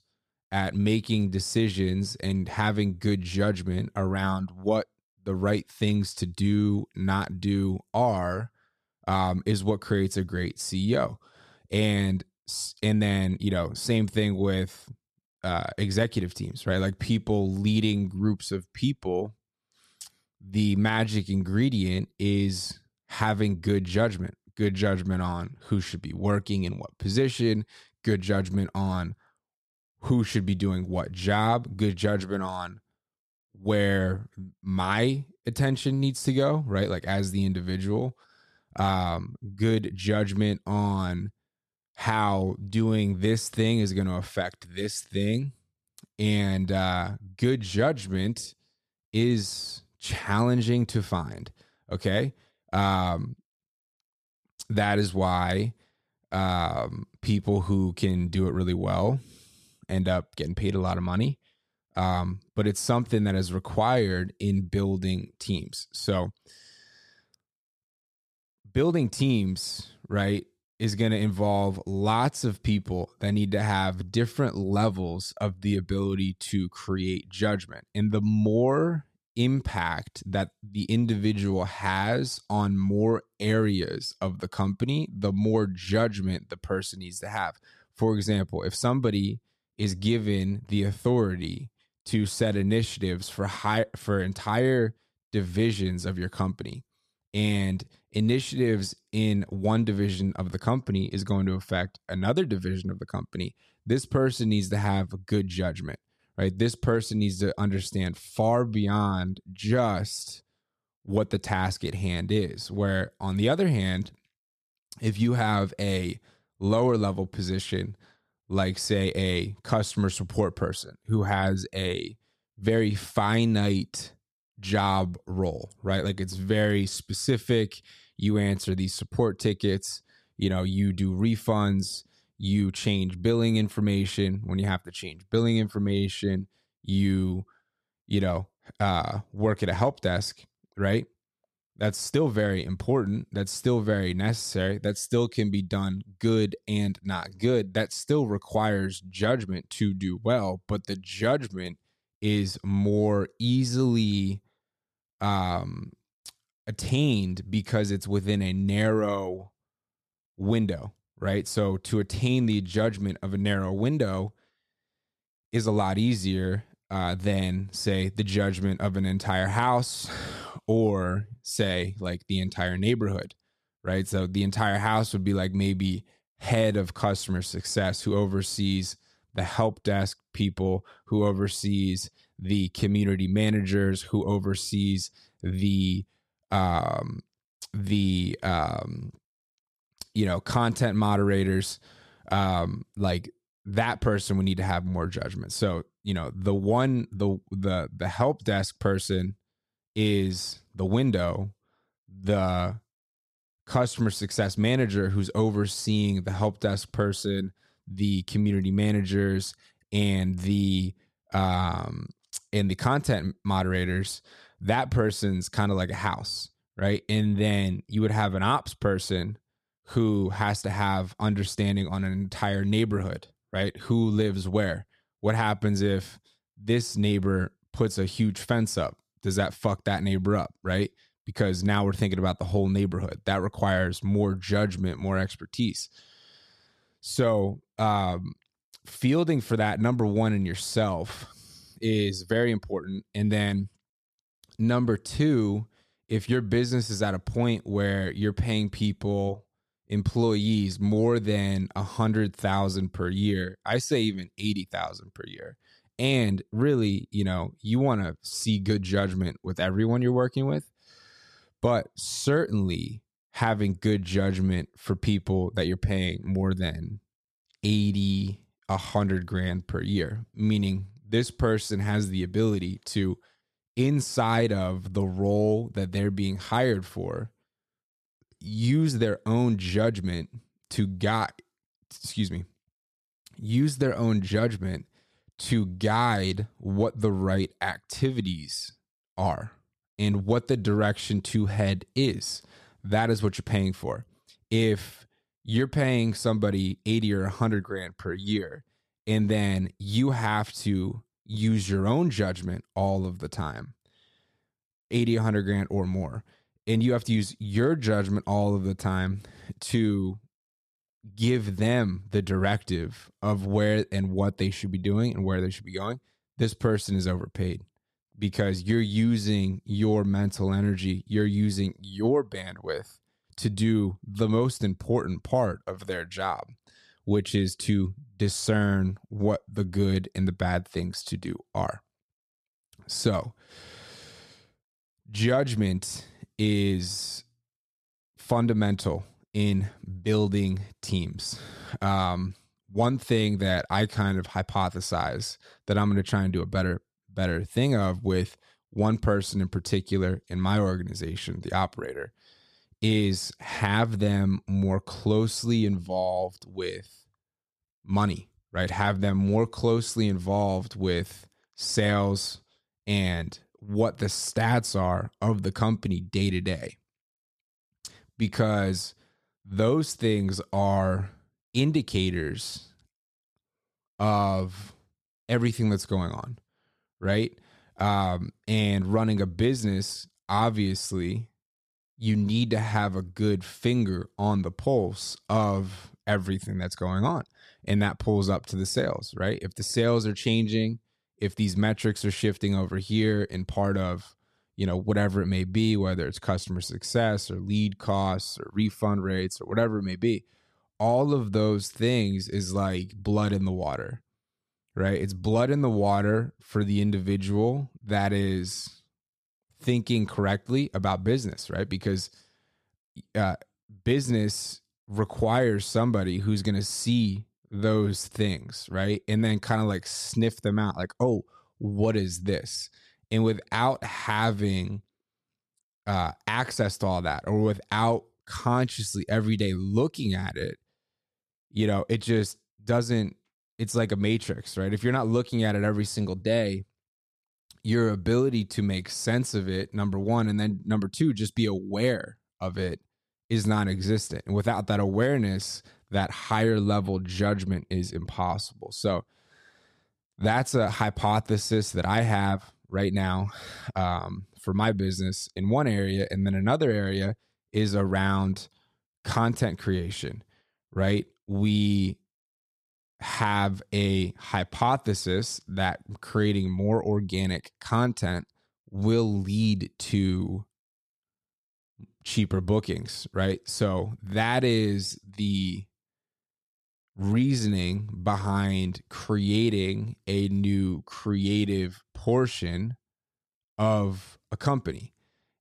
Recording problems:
none

